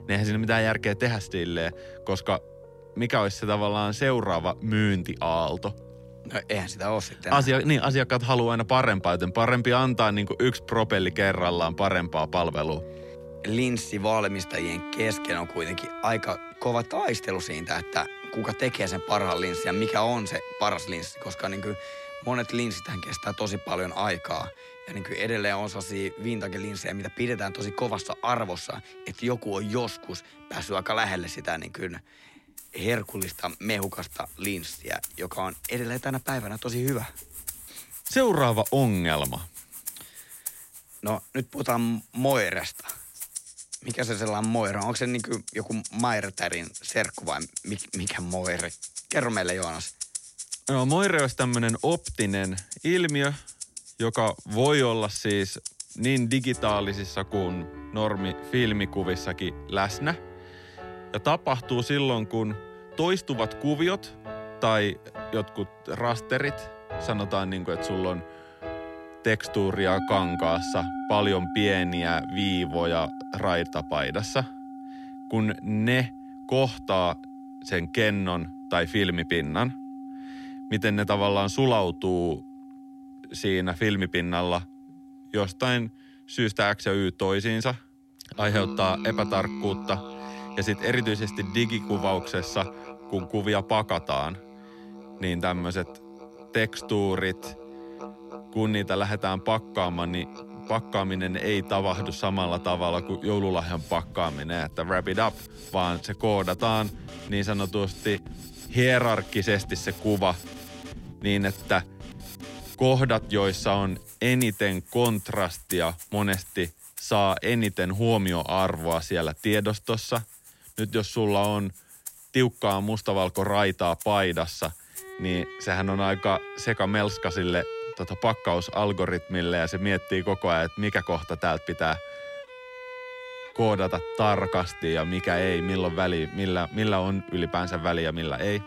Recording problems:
background music; noticeable; throughout; 10 dB below the speech

